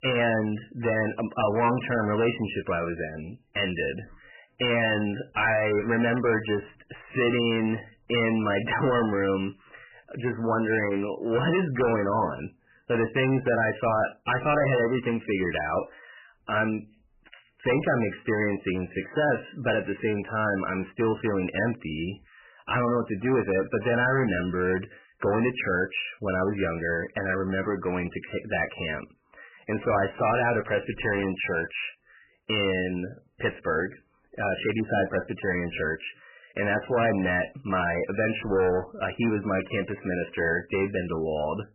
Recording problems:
distortion; heavy; 11% of the sound clipped
garbled, watery; badly; nothing above 3 kHz

